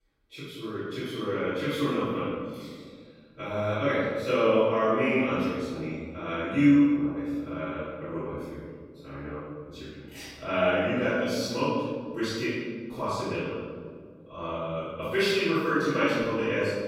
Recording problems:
room echo; strong; dies away in 1.8 s
off-mic speech; far

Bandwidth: 16 kHz